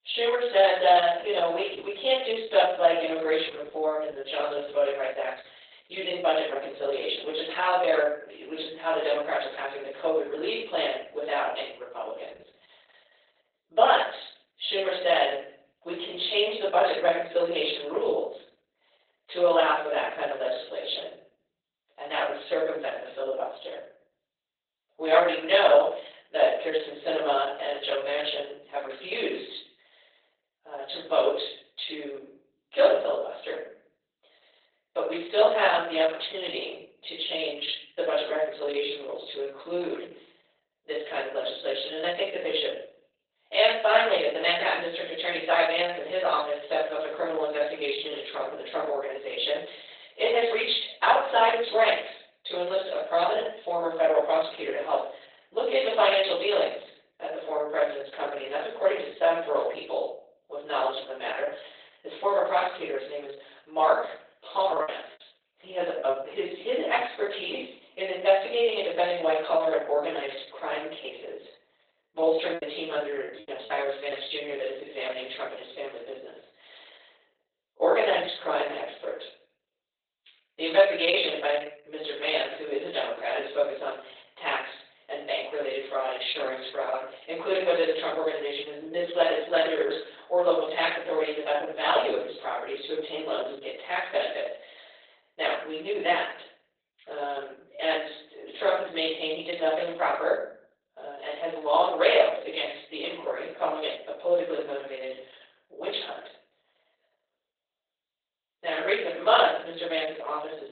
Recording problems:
off-mic speech; far
garbled, watery; badly; nothing above 4 kHz
thin; very; fading below 450 Hz
room echo; noticeable; dies away in 0.6 s
choppy; very; from 1:05 to 1:06 and from 1:12 to 1:14; 14% of the speech affected

